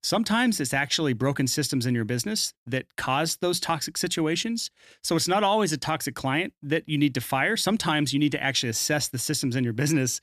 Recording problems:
none

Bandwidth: 14.5 kHz